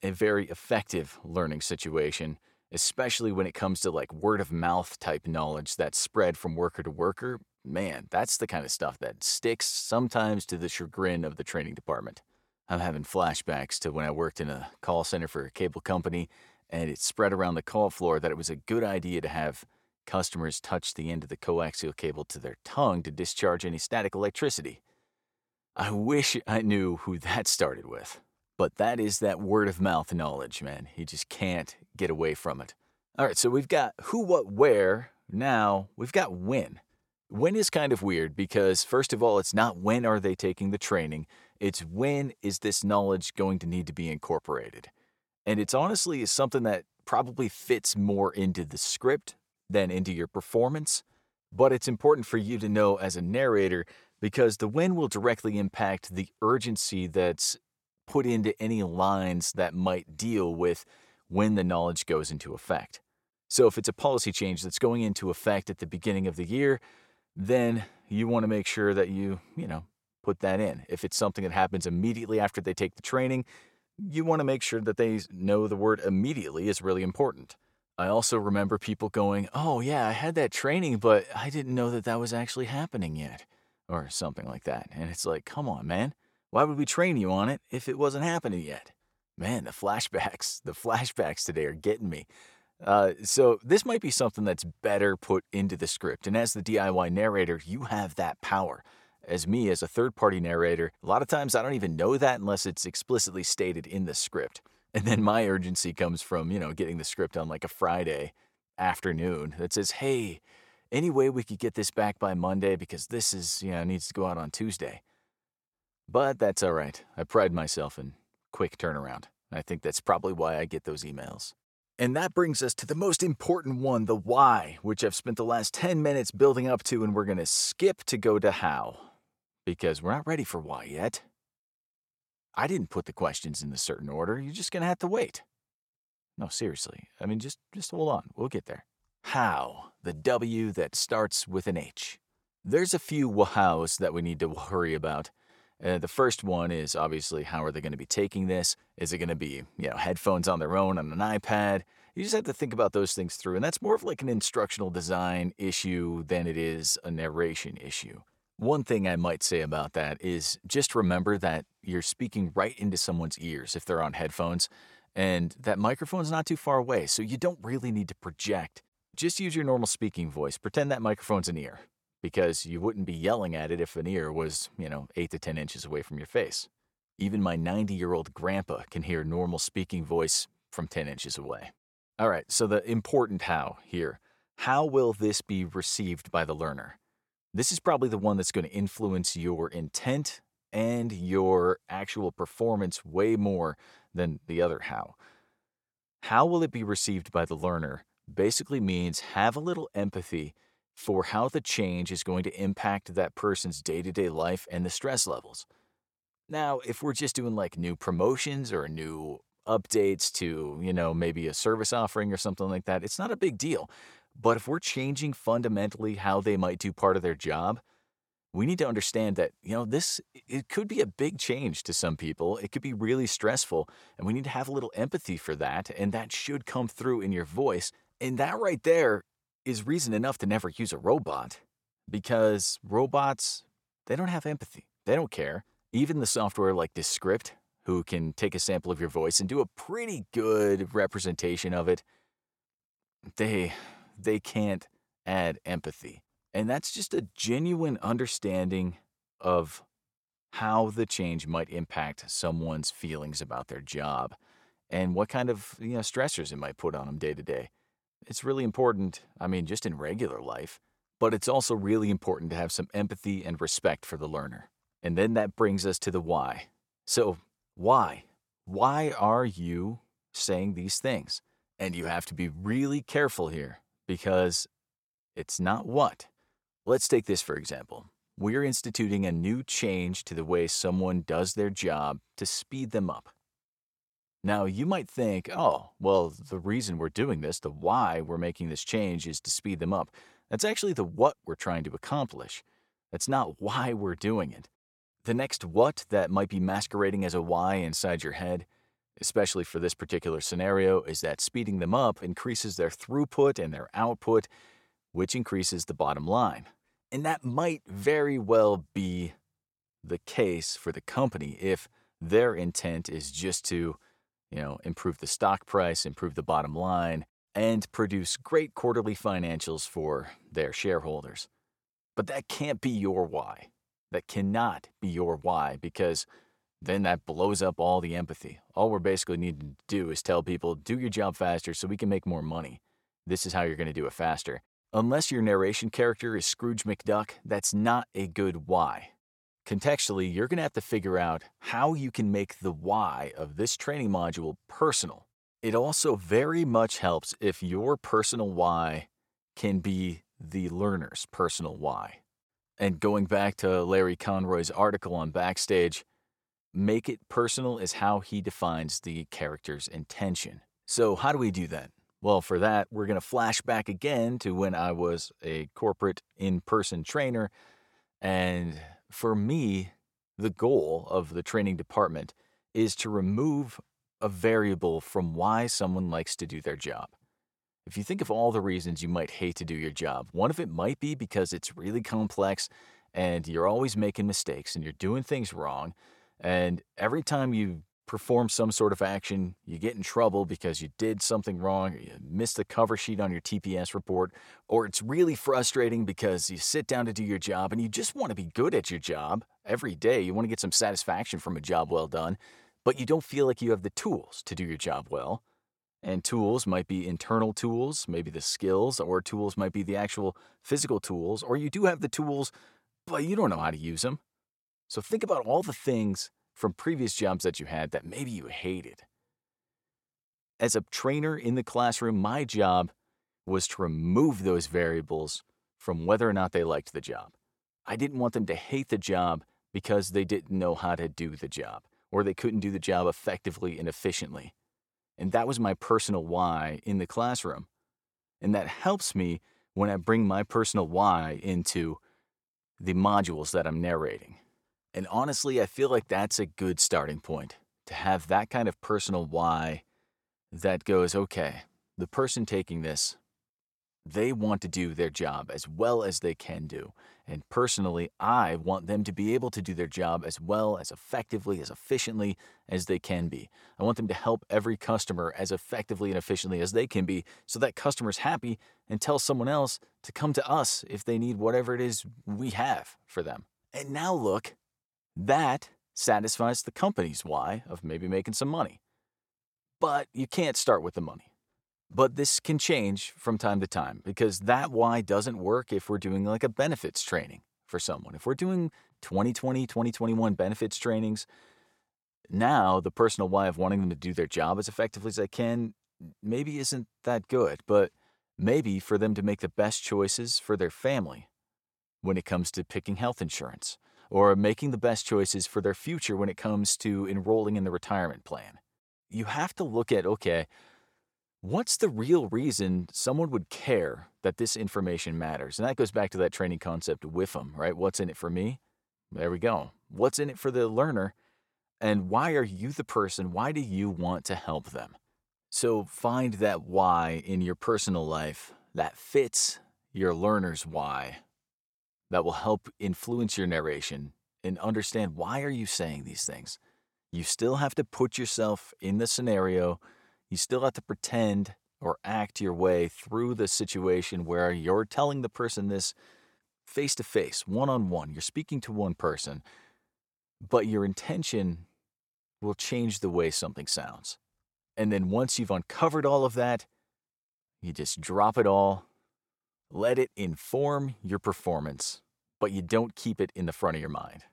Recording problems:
none

